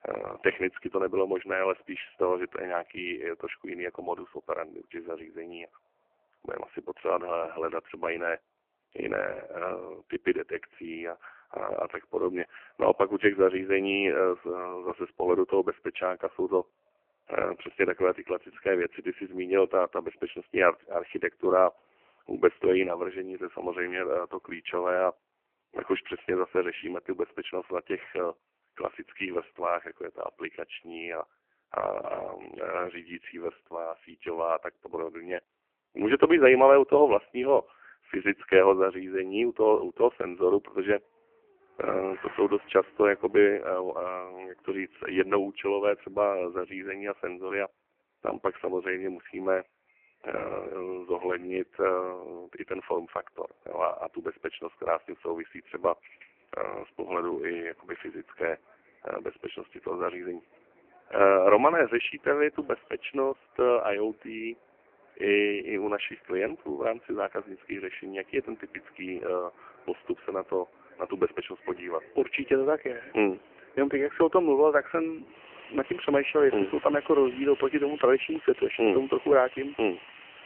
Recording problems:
phone-call audio; poor line; nothing above 3 kHz
traffic noise; faint; throughout; 25 dB below the speech

